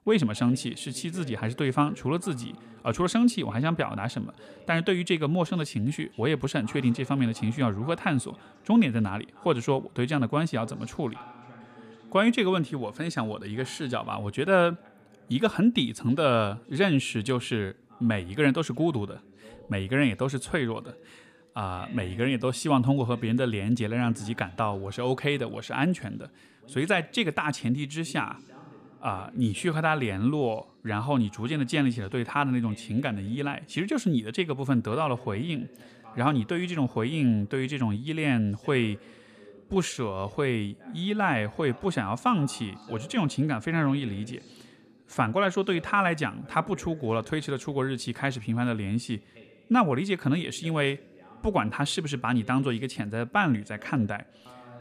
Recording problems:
voice in the background; faint; throughout; 25 dB below the speech

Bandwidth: 14.5 kHz